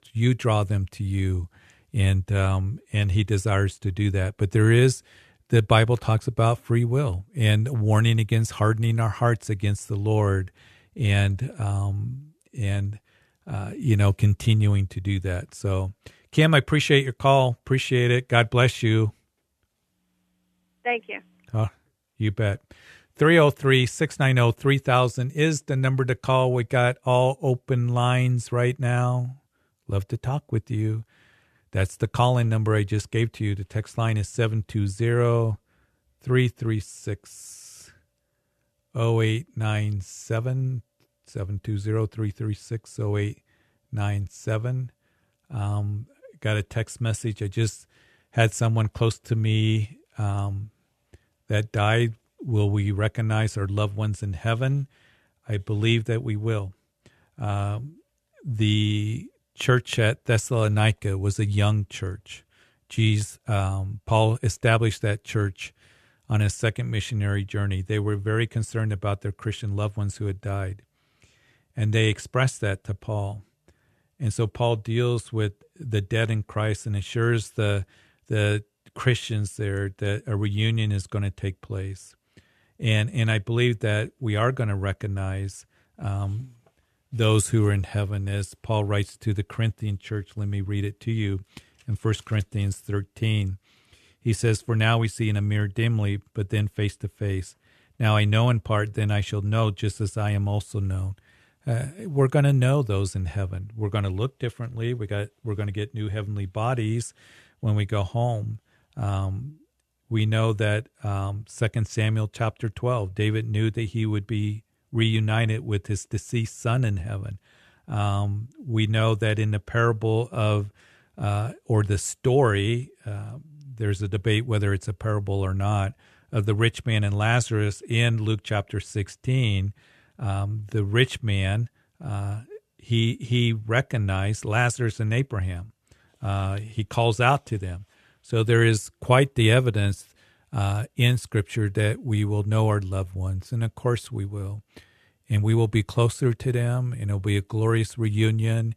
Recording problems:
none

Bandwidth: 13.5 kHz